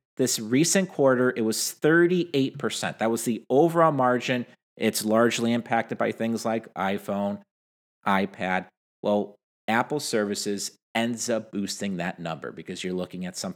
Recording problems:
none

